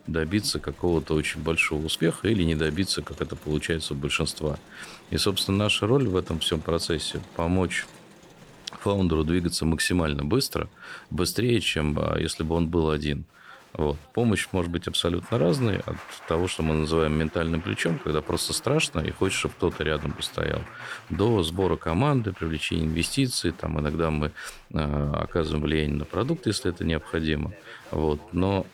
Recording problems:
crowd noise; faint; throughout; 20 dB below the speech

